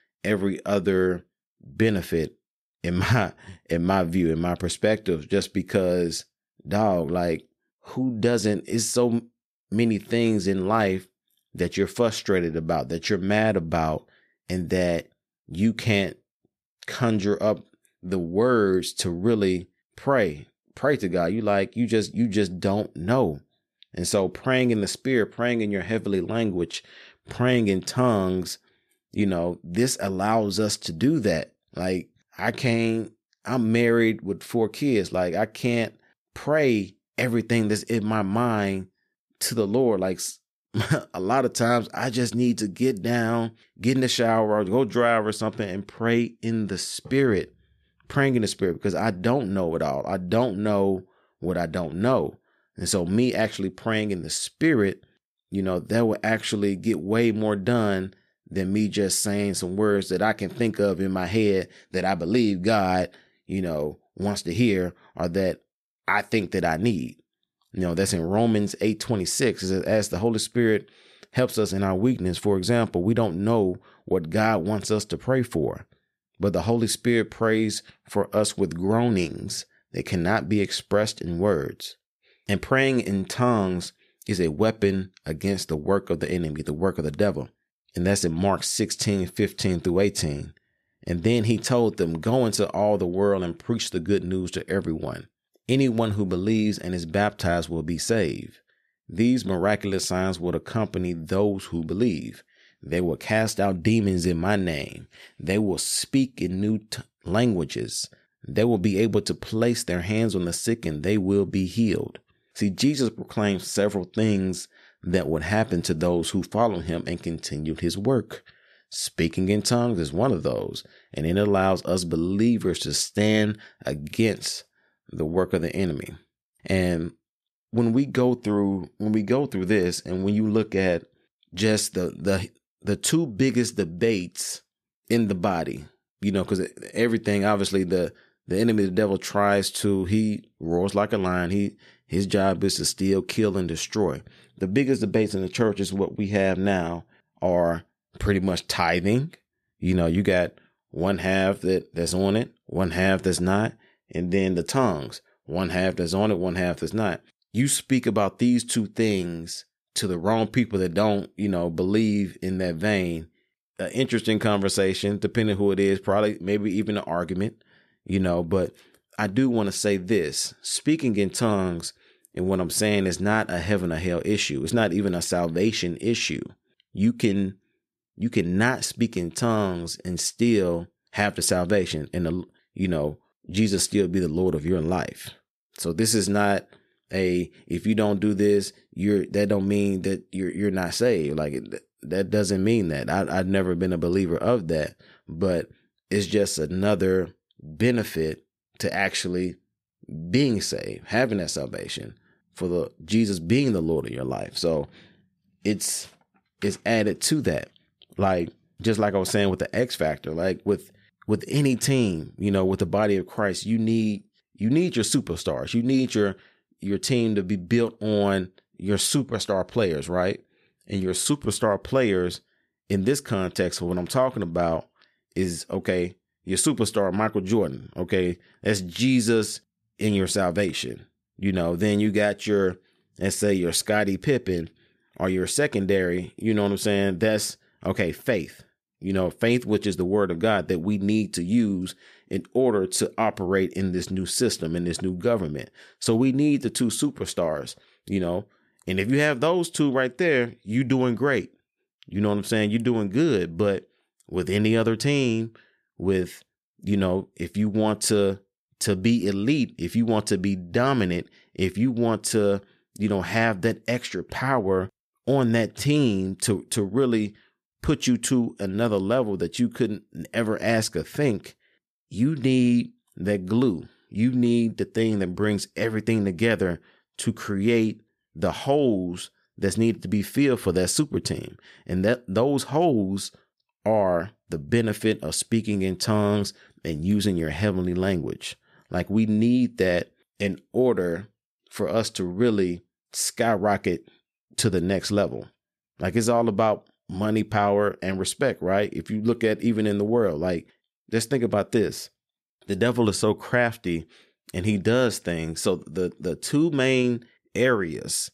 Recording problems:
none

